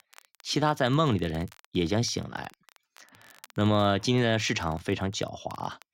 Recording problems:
crackle, like an old record; faint; 30 dB below the speech

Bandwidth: 16 kHz